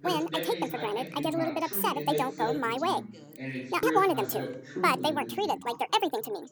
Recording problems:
wrong speed and pitch; too fast and too high; 1.6 times normal speed
background chatter; loud; throughout; 2 voices, 7 dB below the speech

